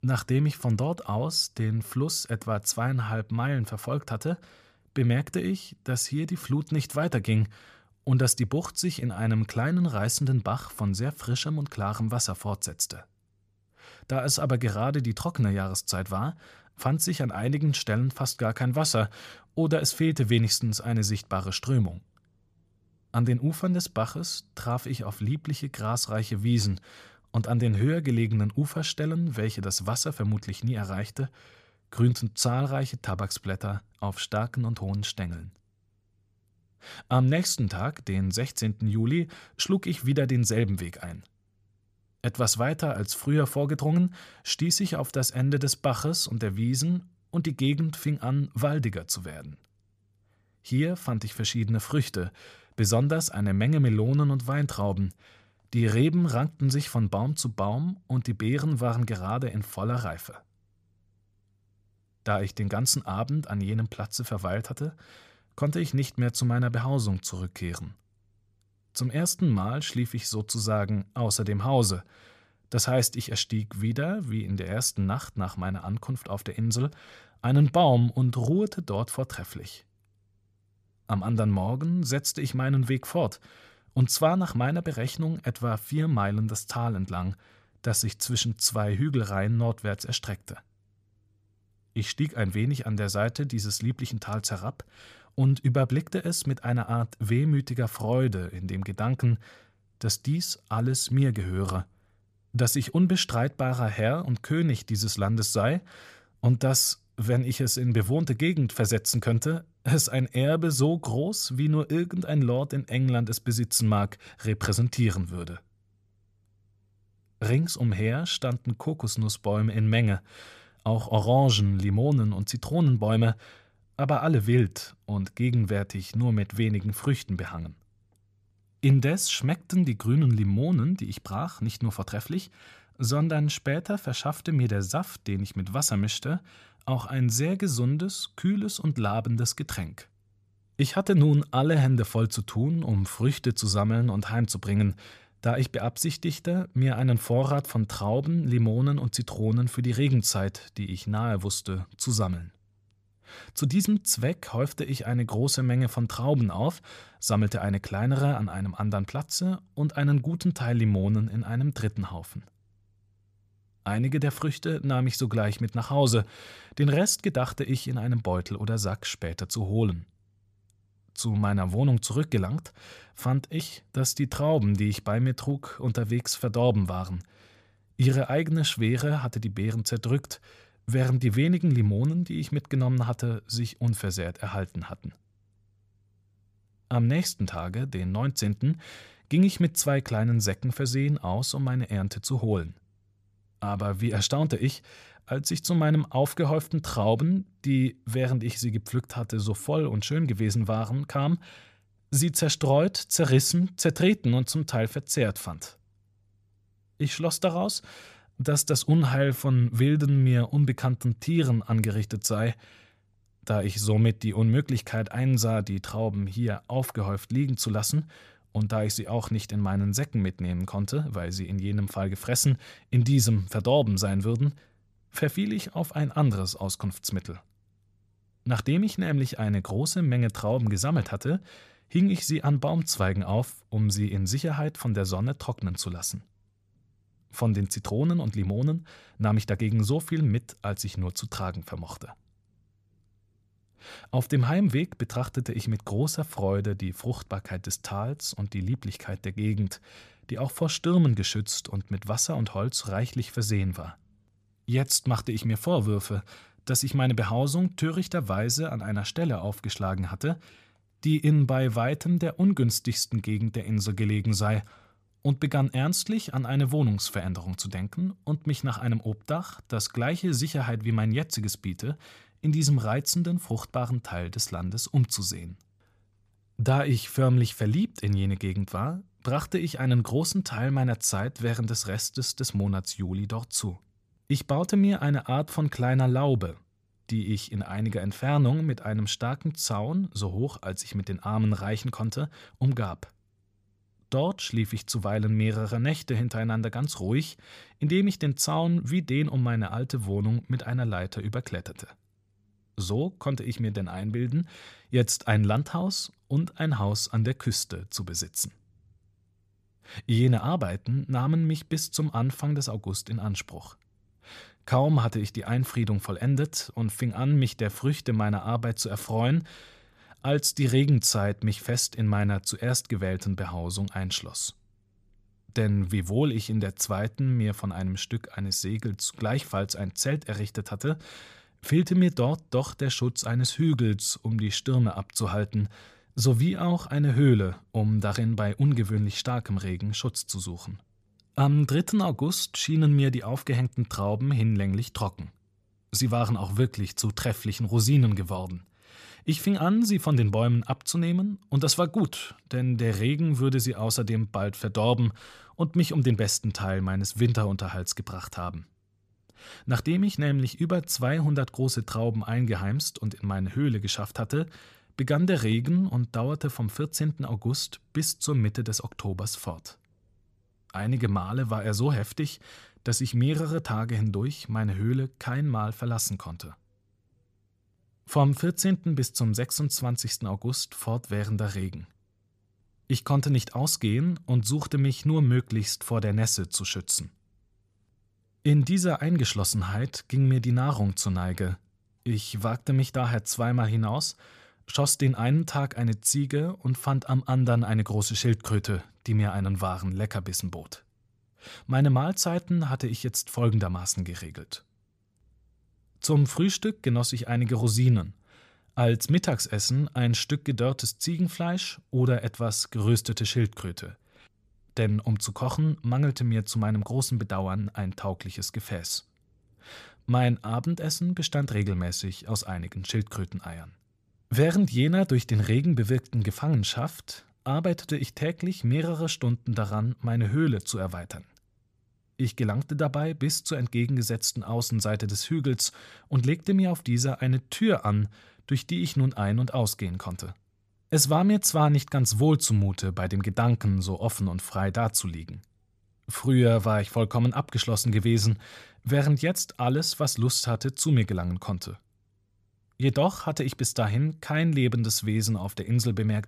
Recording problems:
none

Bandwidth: 14.5 kHz